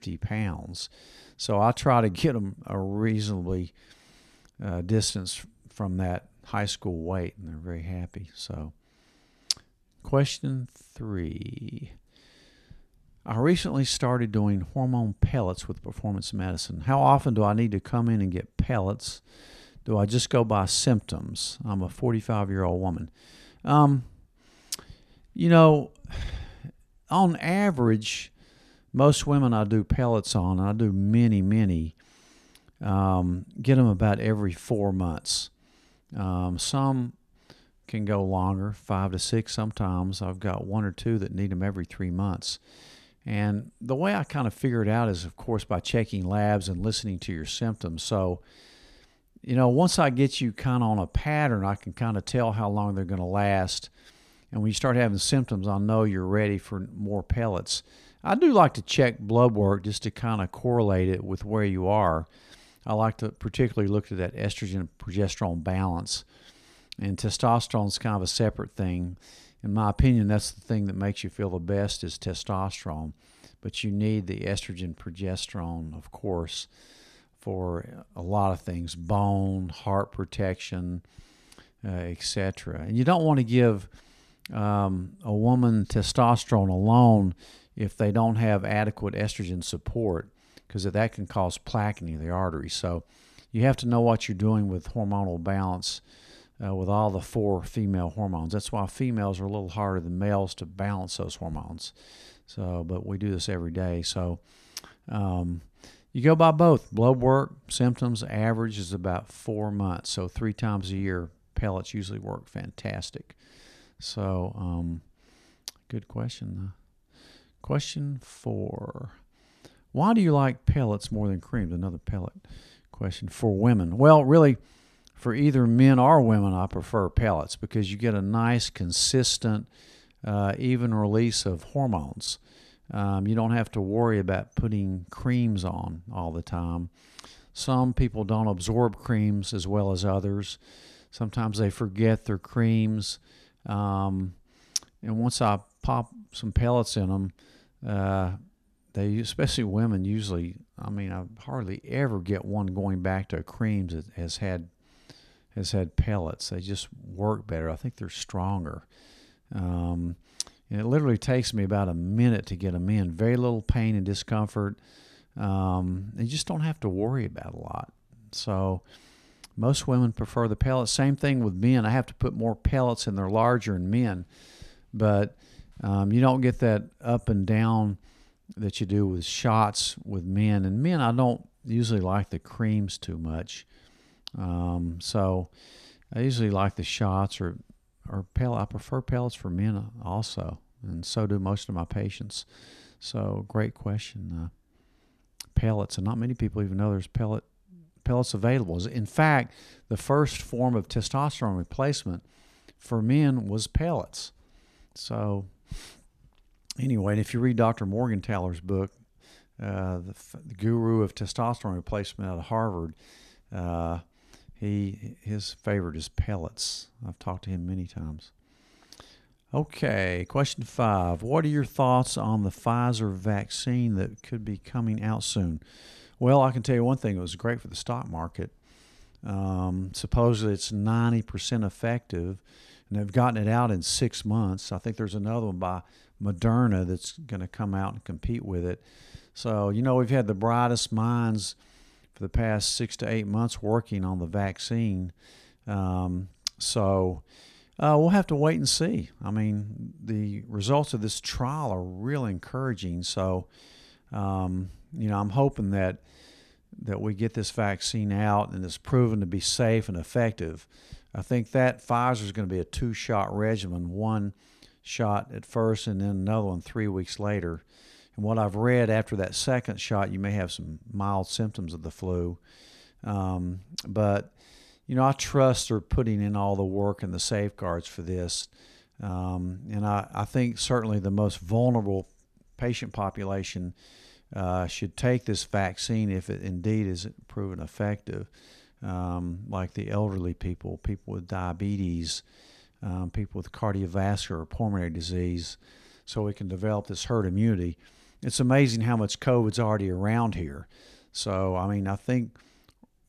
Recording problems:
none

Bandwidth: 14 kHz